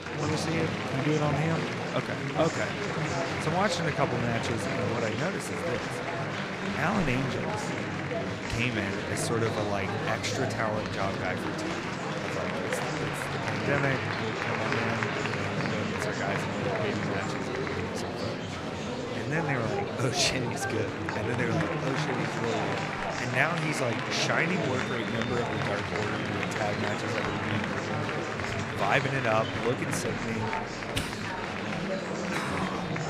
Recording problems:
murmuring crowd; very loud; throughout; 1 dB above the speech

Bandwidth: 14.5 kHz